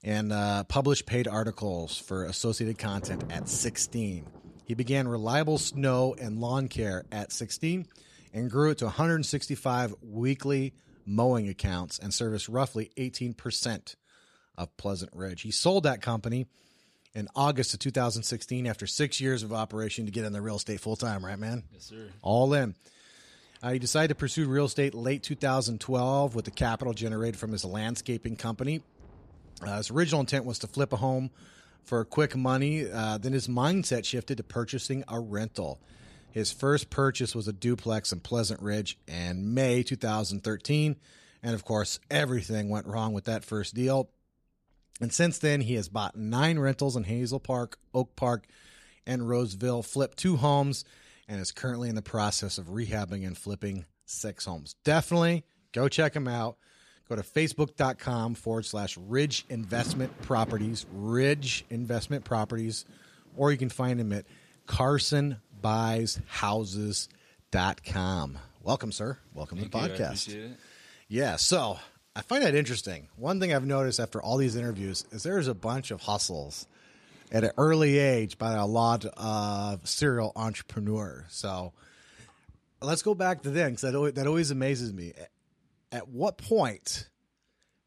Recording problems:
rain or running water; faint; throughout; 20 dB below the speech

